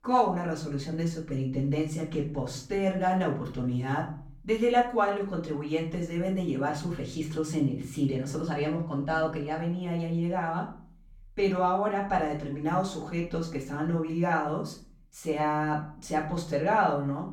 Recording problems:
off-mic speech; far
room echo; slight; dies away in 0.4 s

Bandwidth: 17.5 kHz